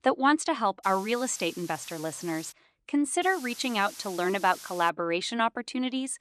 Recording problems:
hiss; noticeable; from 1 to 2.5 s and from 3 to 5 s; 15 dB below the speech

